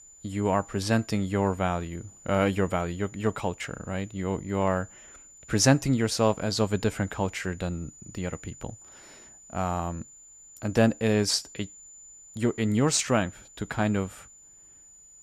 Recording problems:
high-pitched whine; faint; throughout; 7 kHz, 20 dB below the speech

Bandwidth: 15 kHz